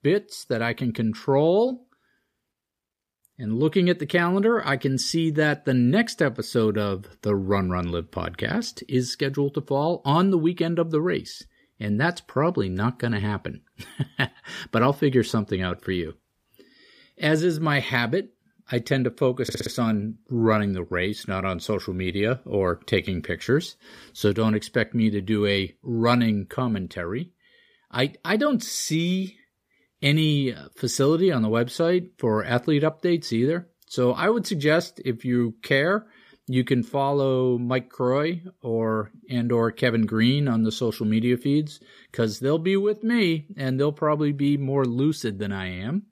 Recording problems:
audio stuttering; at 19 s

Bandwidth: 15 kHz